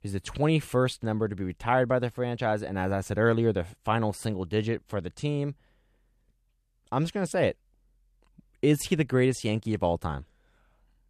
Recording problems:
none

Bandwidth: 14 kHz